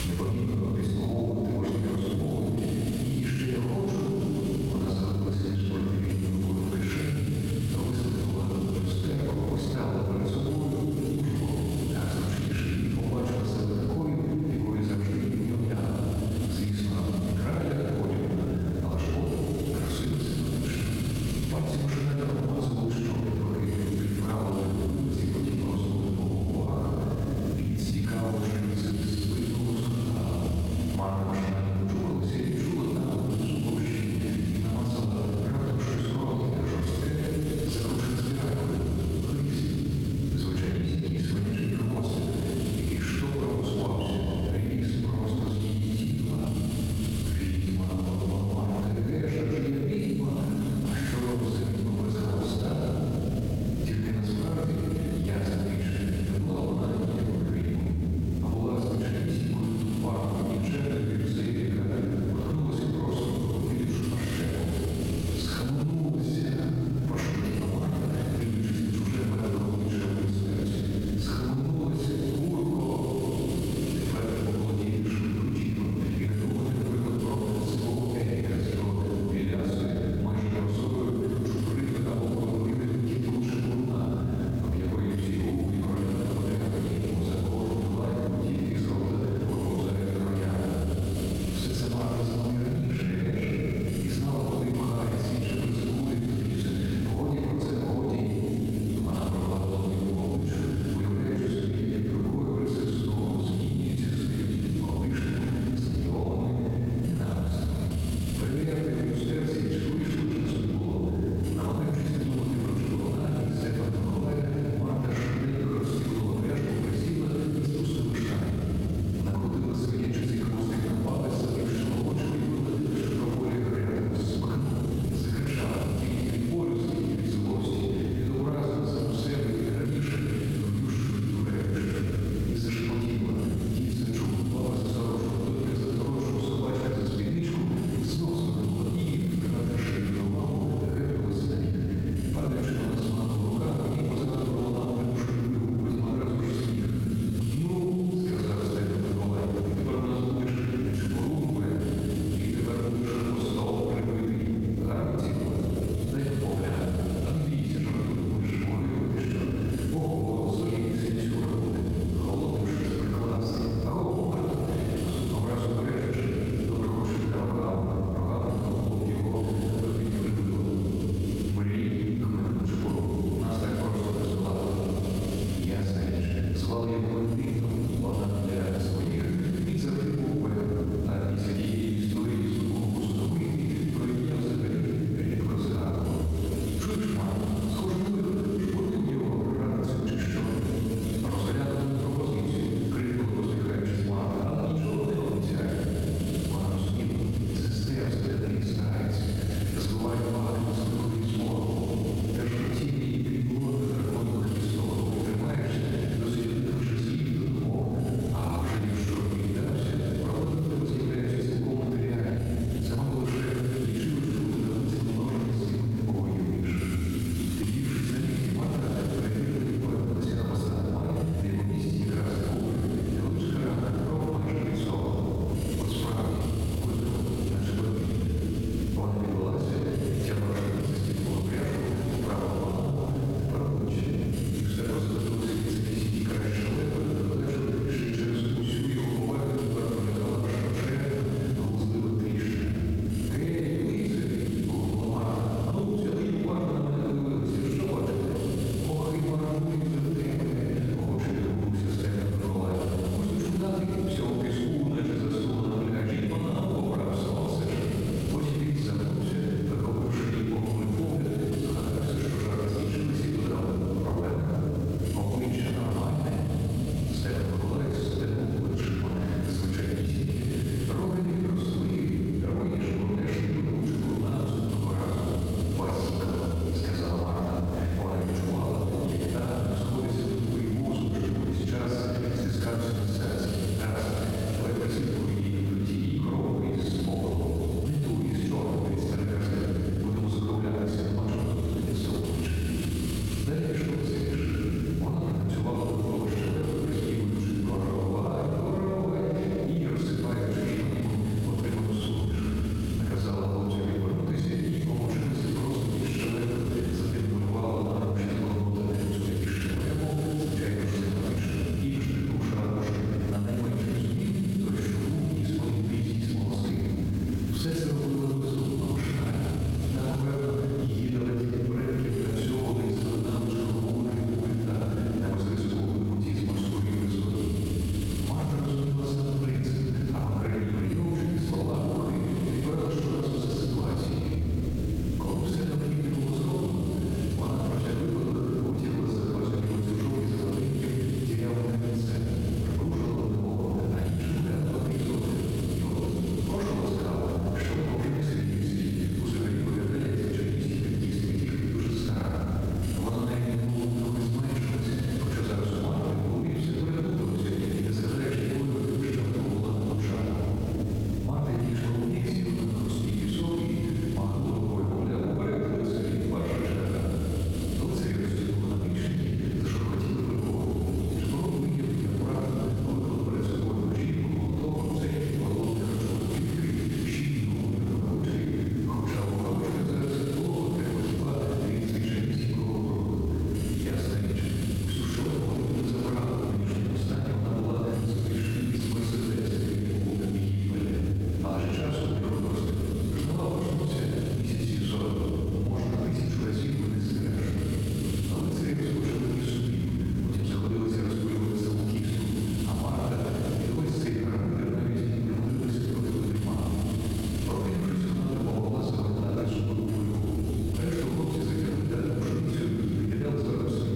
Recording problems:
room echo; strong; dies away in 3 s
off-mic speech; far
squashed, flat; somewhat
electrical hum; noticeable; throughout; 60 Hz, 20 dB below the speech
hiss; very faint; throughout; 20 dB below the speech

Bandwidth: 16.5 kHz